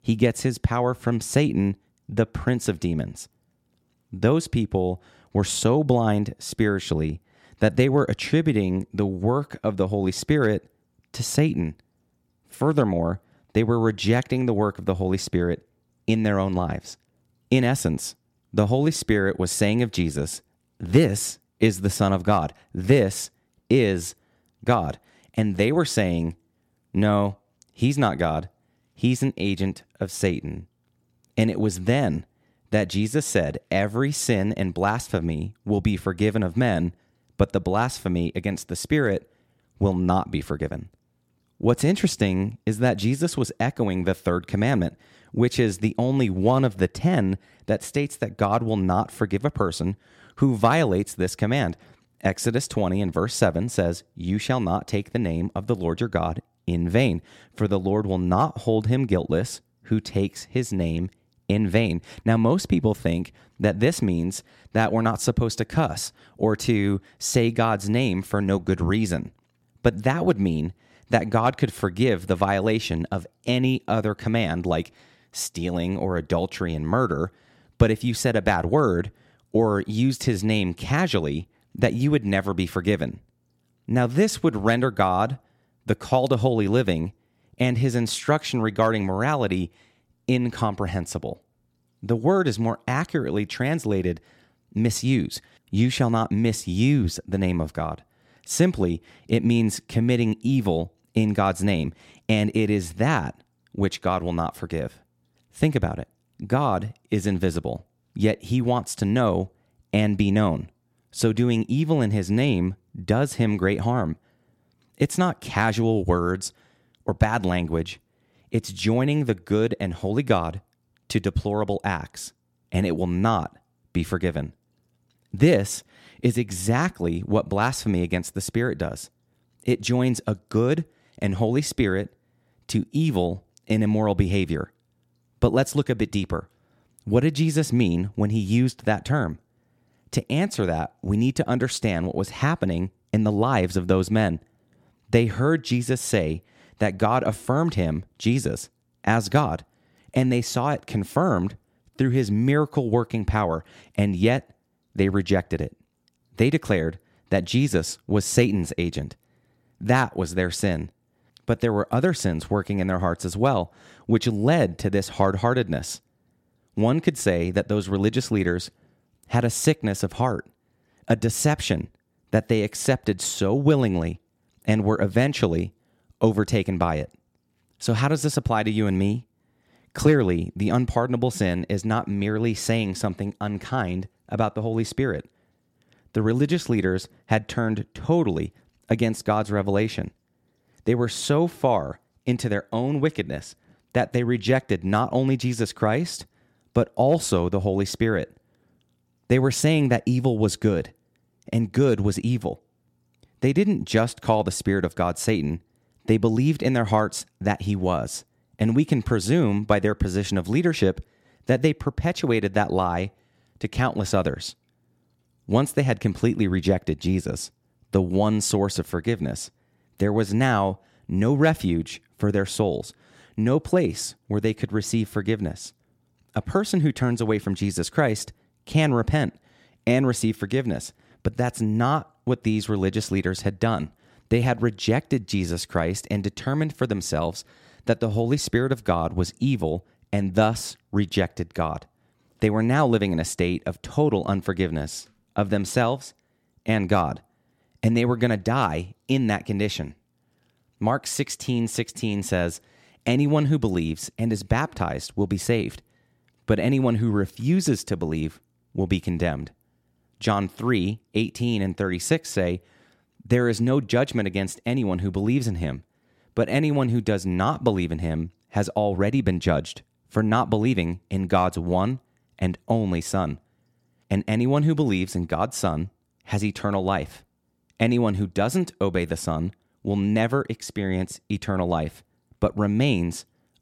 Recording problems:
none

